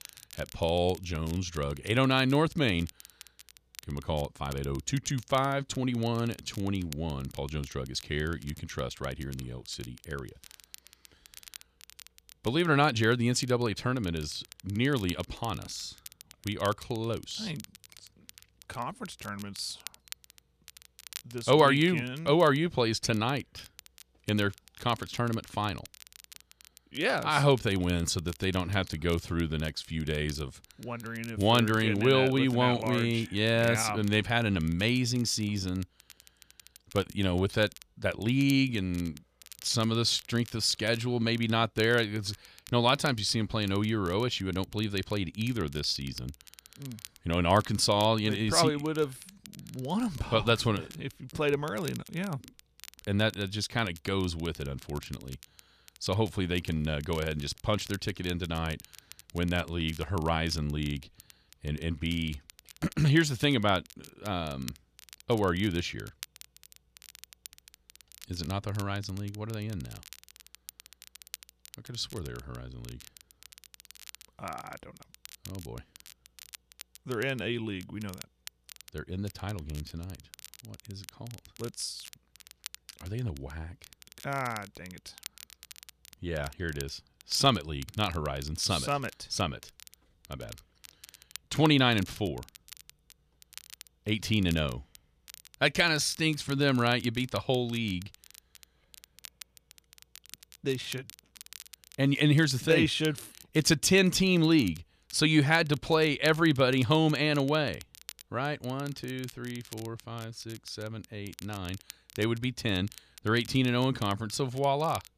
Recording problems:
crackle, like an old record; faint; 20 dB below the speech

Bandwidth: 14.5 kHz